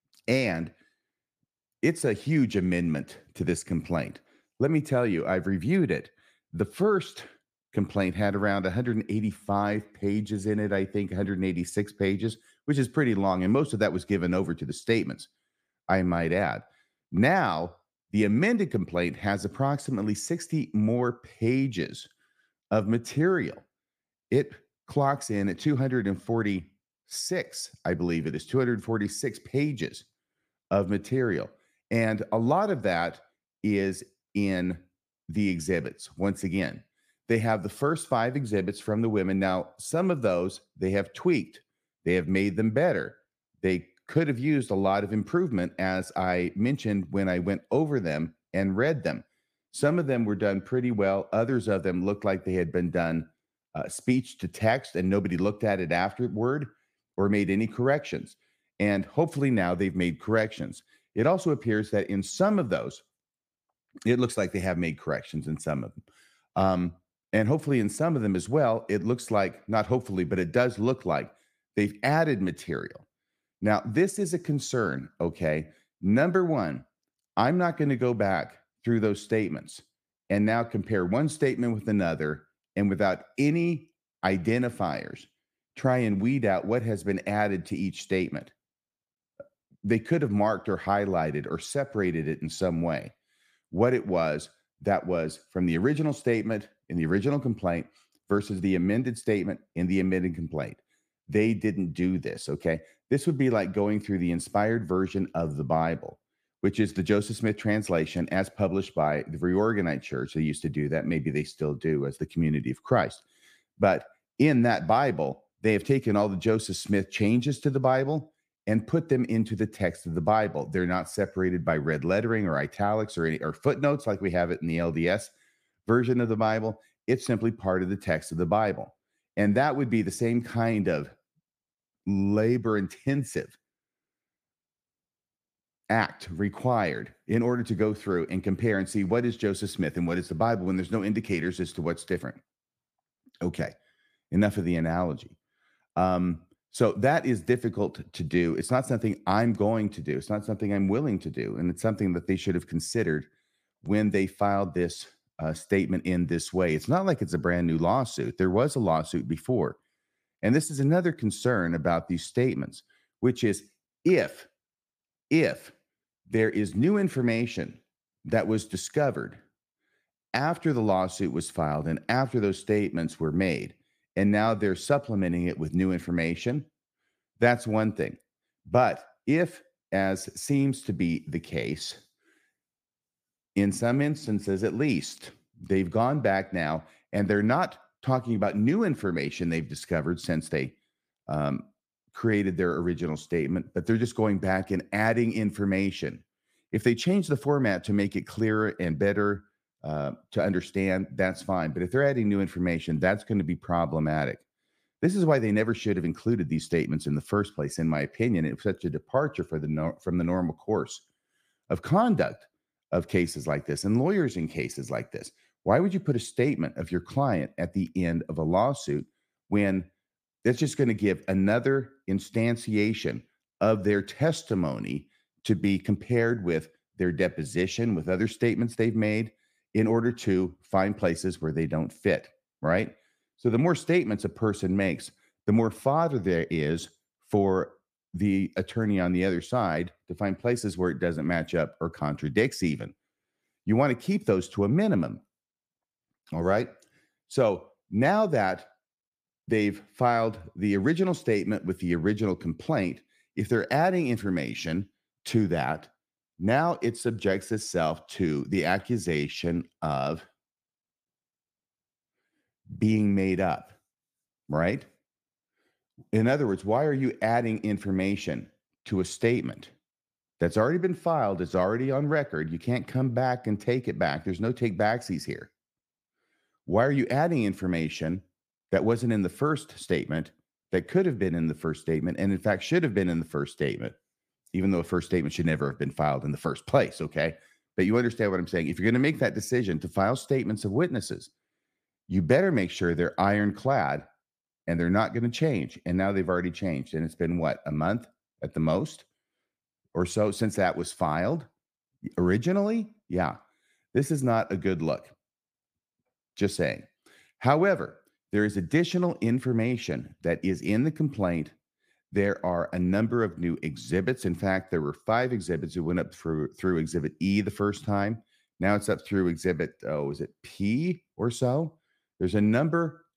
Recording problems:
none

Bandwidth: 15 kHz